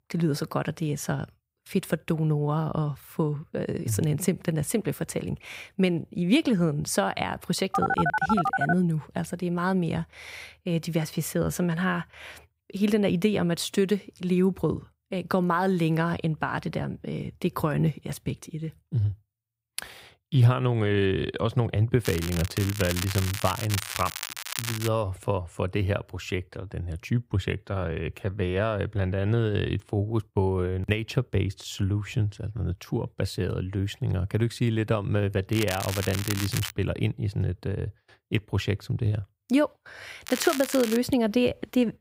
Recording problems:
crackling; loud; from 22 to 25 s, from 36 to 37 s and at 40 s; 6 dB below the speech
phone ringing; loud; at 7.5 s; peak 2 dB above the speech

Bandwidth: 15.5 kHz